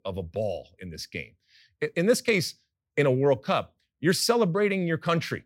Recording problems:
none

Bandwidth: 16 kHz